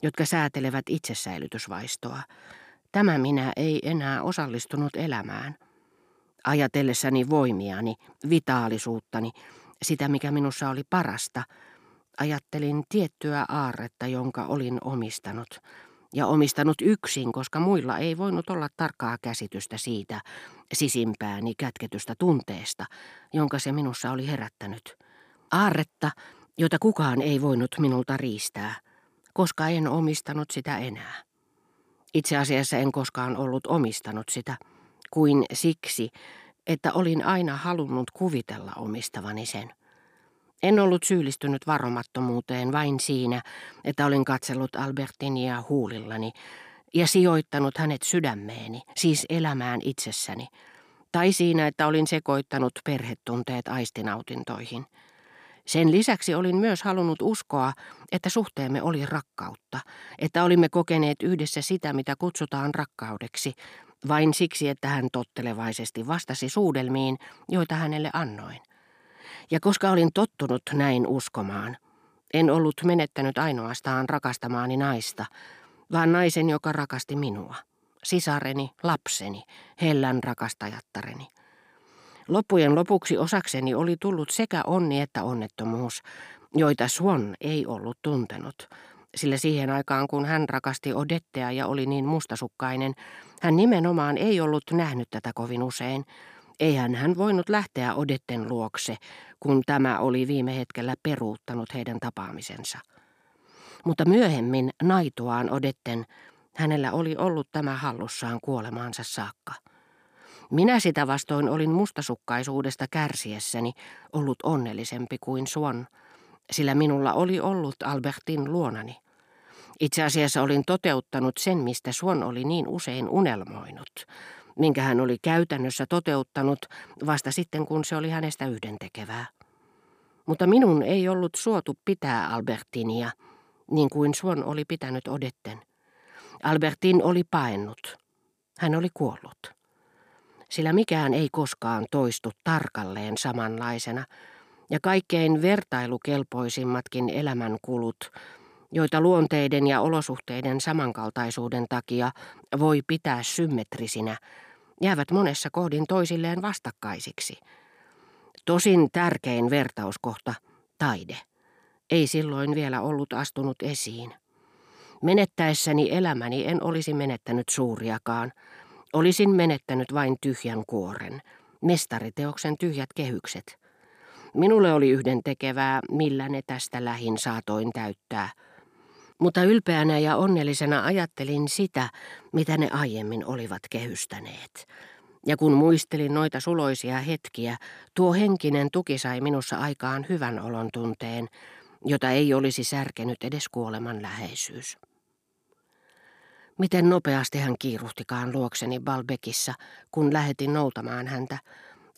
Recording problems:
none

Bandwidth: 15 kHz